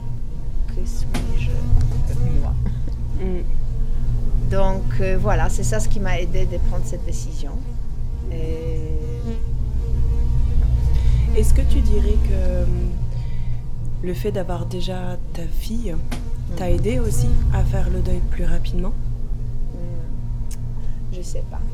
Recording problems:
electrical hum; very faint; throughout; 60 Hz, 8 dB below the speech

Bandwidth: 17 kHz